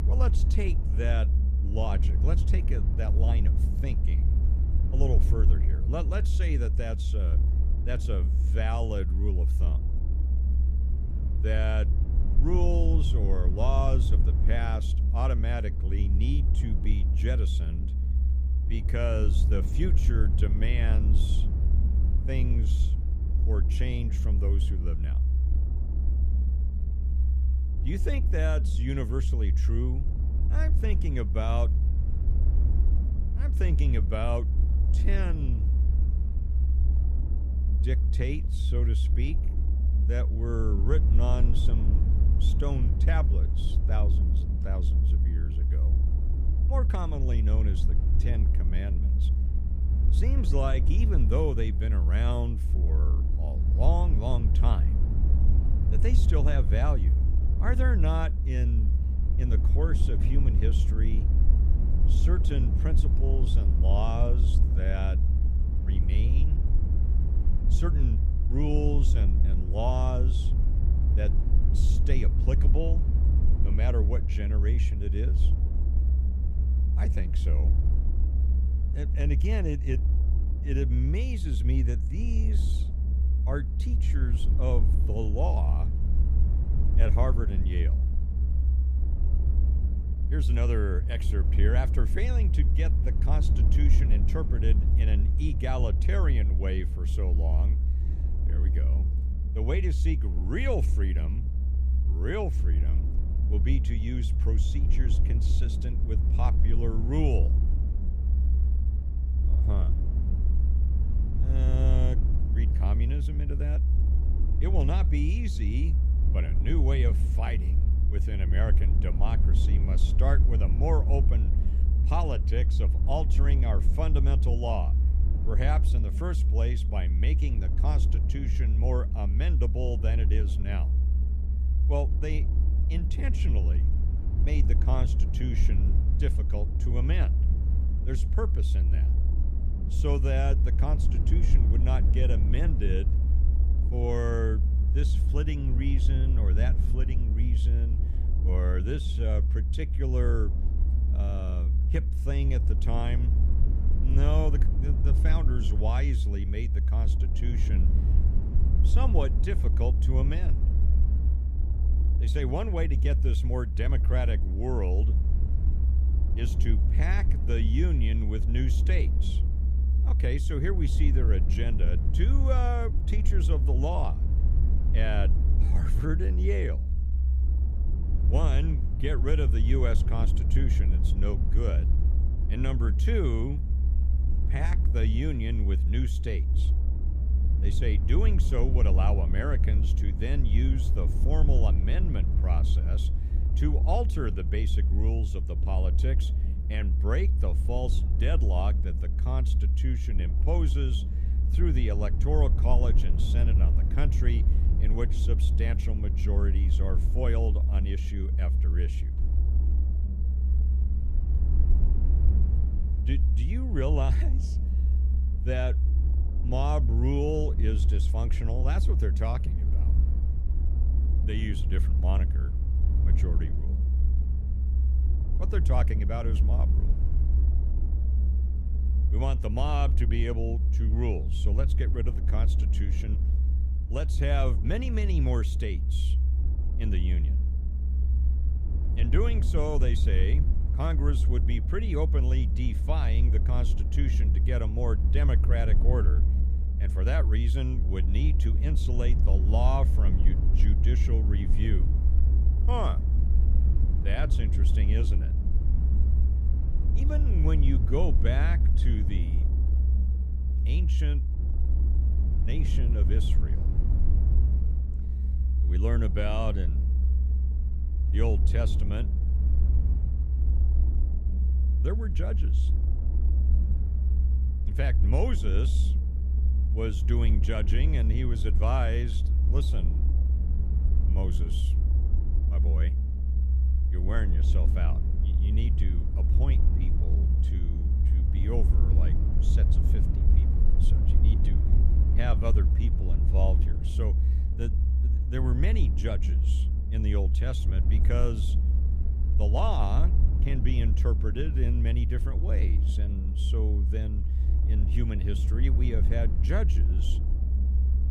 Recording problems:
low rumble; loud; throughout; 6 dB below the speech

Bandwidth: 15 kHz